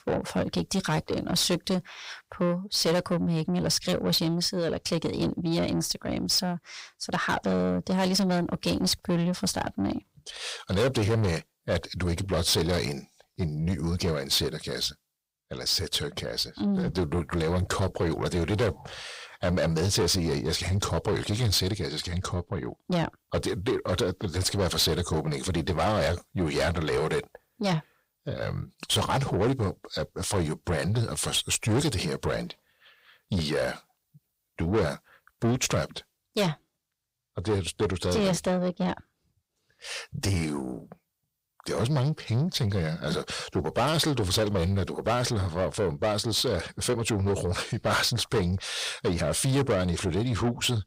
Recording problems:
distortion; heavy; 7 dB below the speech

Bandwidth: 15.5 kHz